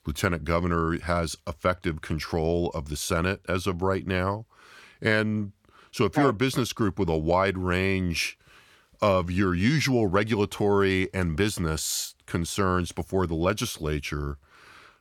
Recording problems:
none

